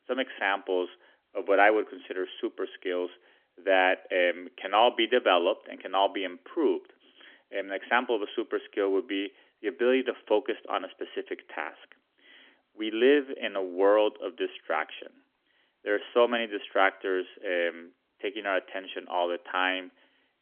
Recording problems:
phone-call audio; nothing above 3.5 kHz

